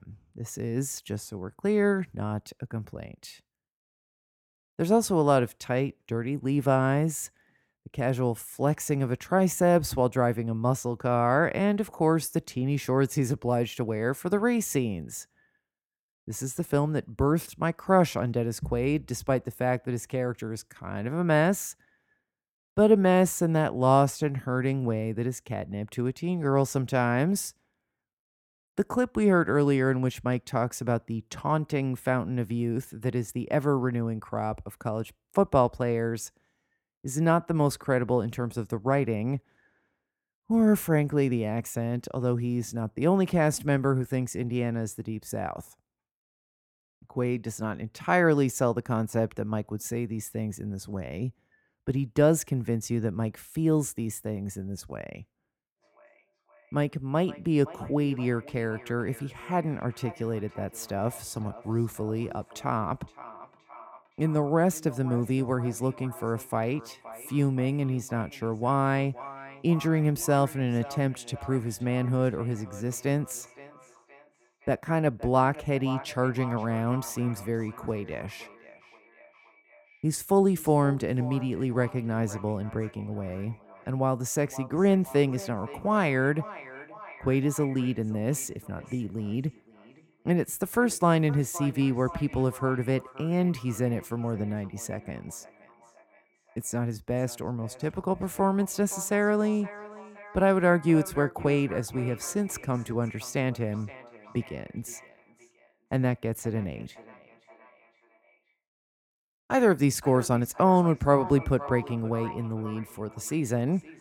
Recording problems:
echo of what is said; faint; from 56 s on; 520 ms later, 20 dB below the speech

